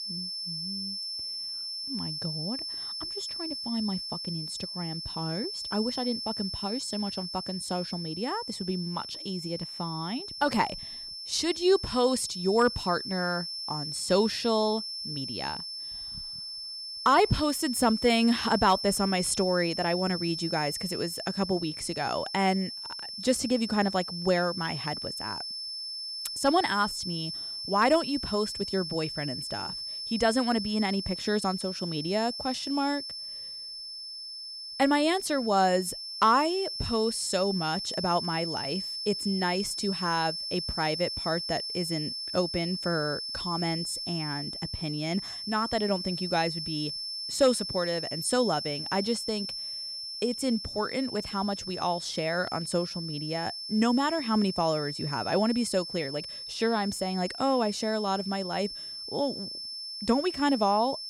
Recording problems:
high-pitched whine; loud; throughout; 5.5 kHz, 5 dB below the speech

